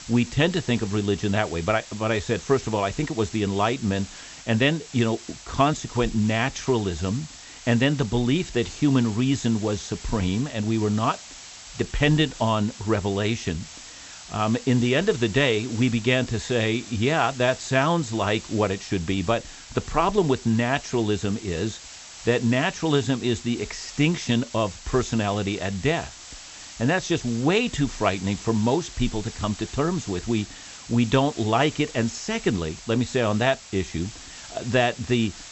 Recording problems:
high frequencies cut off; noticeable; nothing above 8 kHz
hiss; noticeable; throughout; 15 dB below the speech

